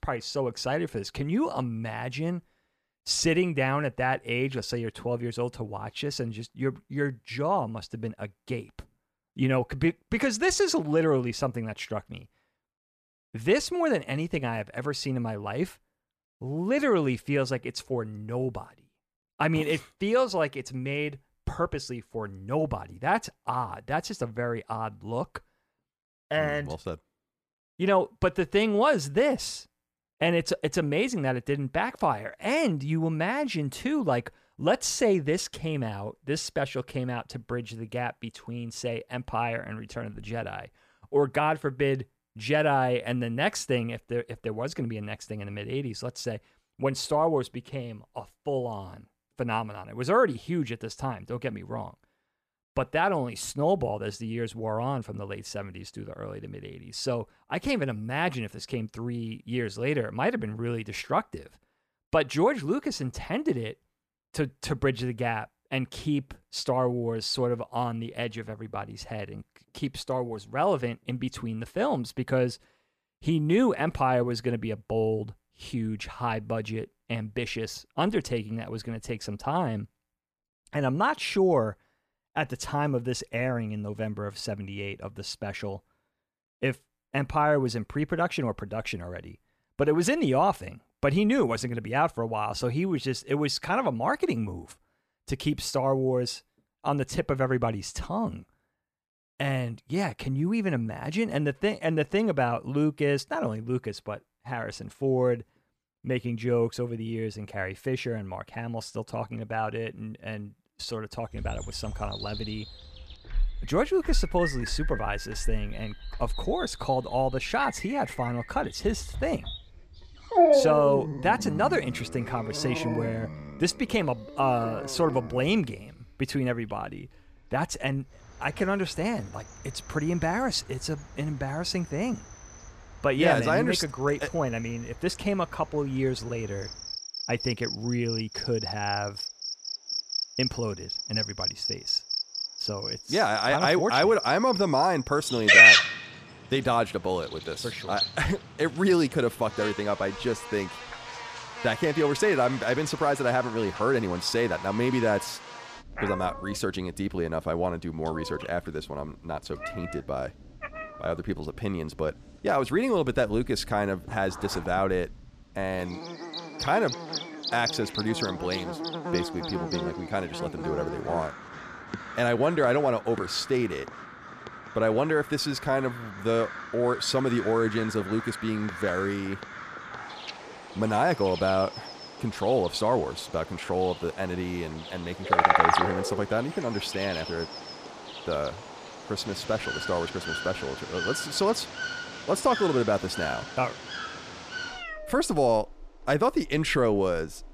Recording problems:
animal sounds; loud; from 1:51 on; as loud as the speech

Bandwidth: 14.5 kHz